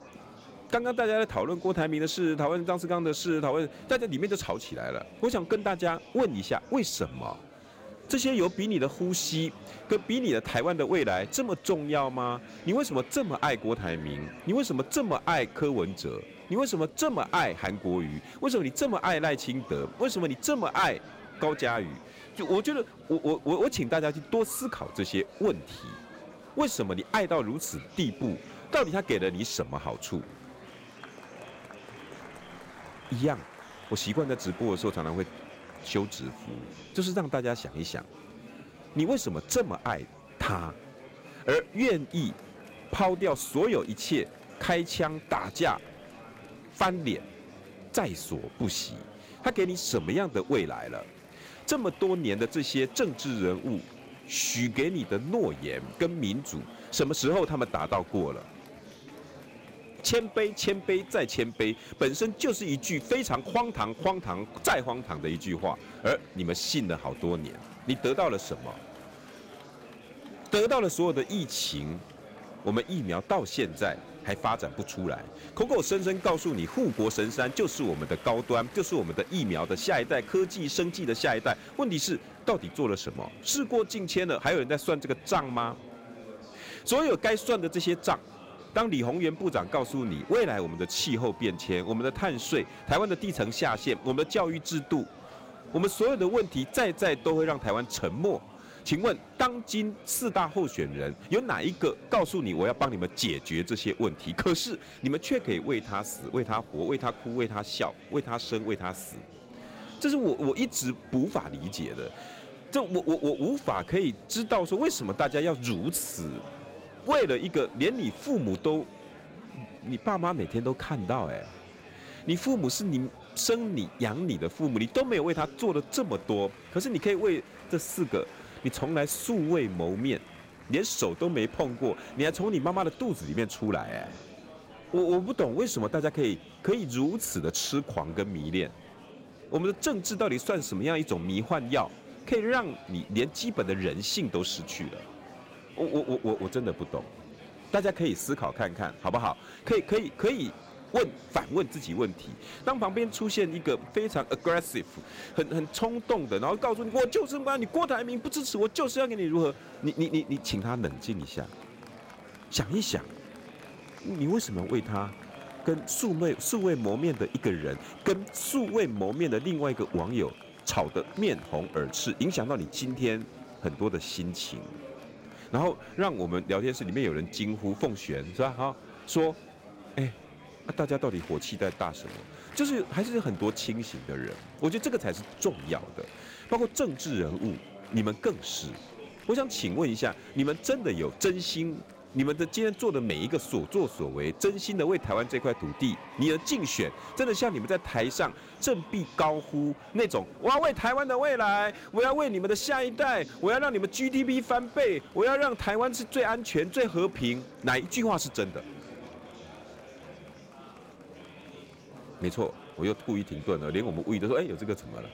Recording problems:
murmuring crowd; noticeable; throughout; 20 dB below the speech

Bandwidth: 16 kHz